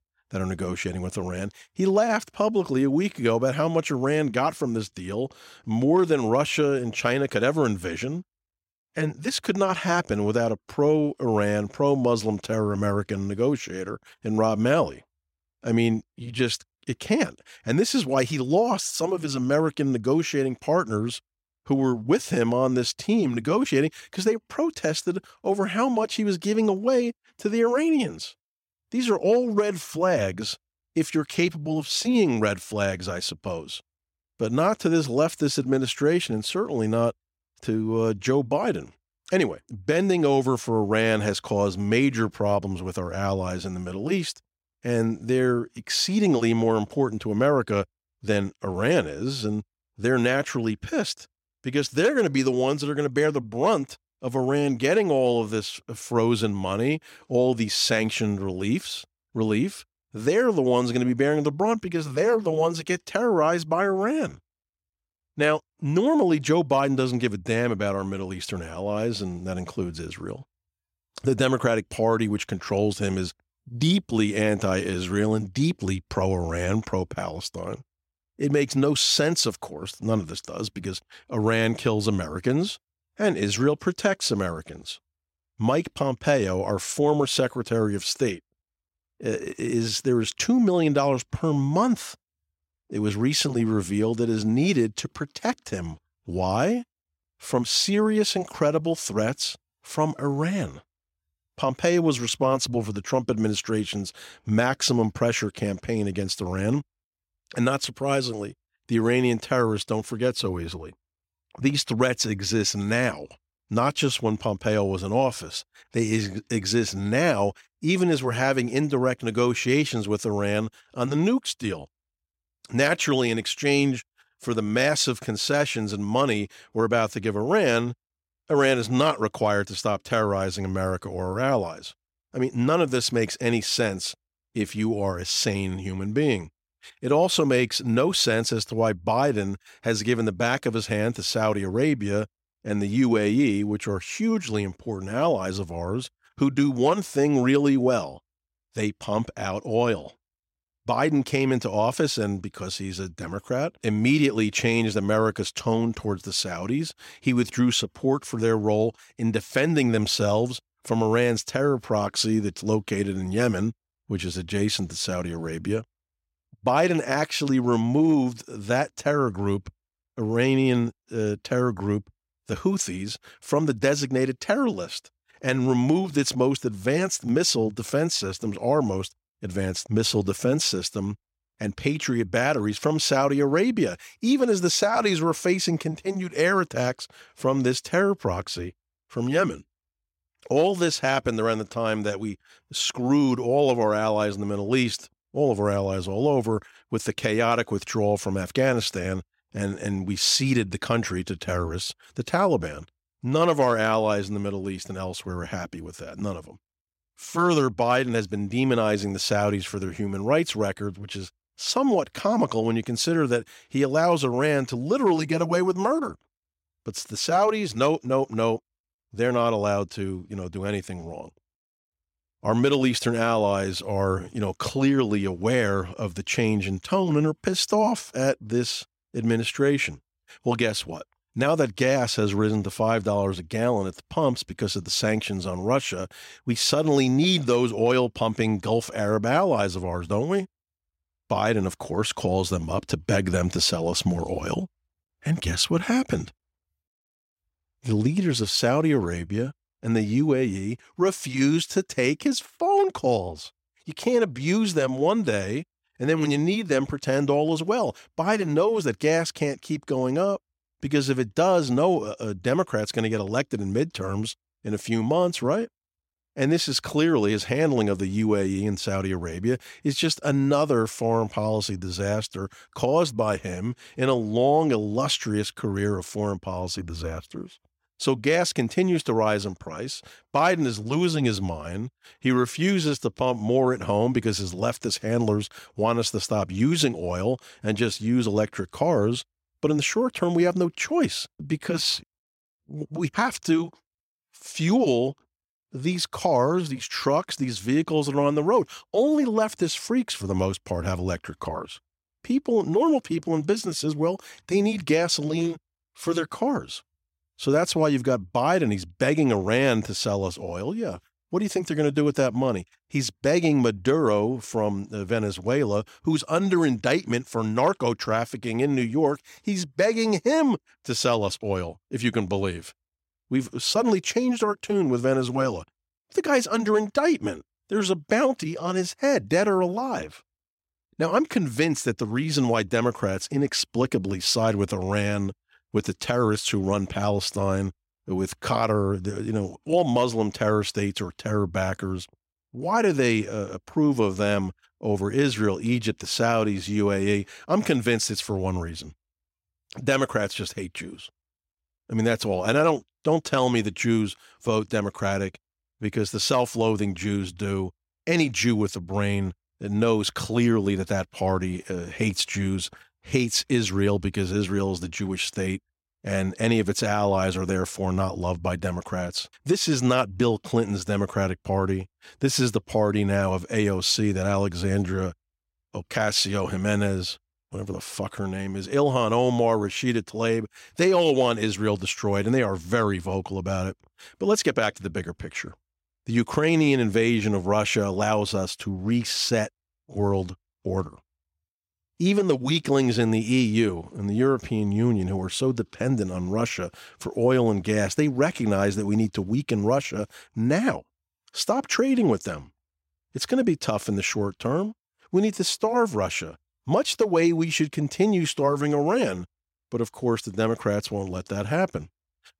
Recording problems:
none

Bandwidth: 16 kHz